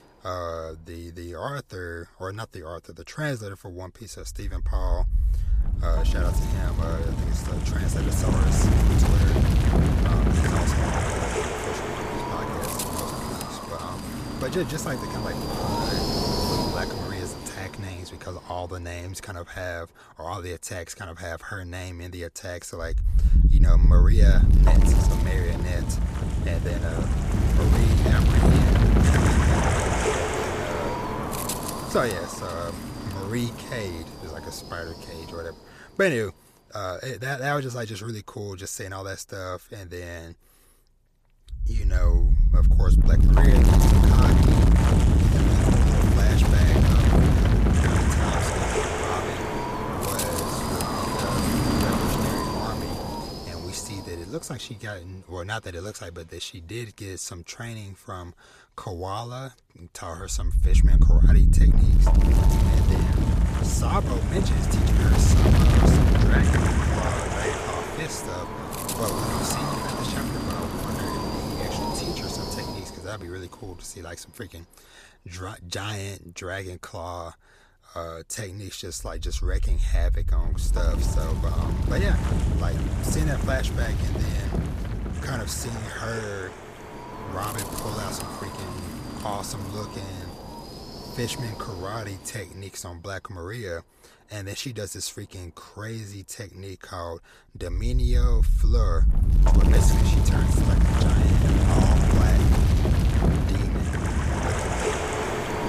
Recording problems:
wind noise on the microphone; heavy; 4 dB above the speech

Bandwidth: 14.5 kHz